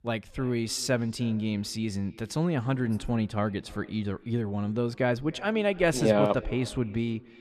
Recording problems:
echo of what is said; faint; throughout; 290 ms later, 20 dB below the speech

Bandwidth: 14 kHz